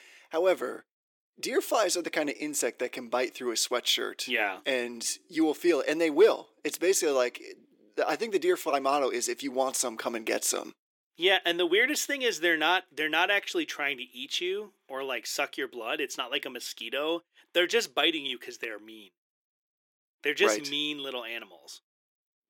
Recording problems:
thin; somewhat; fading below 350 Hz

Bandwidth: 17.5 kHz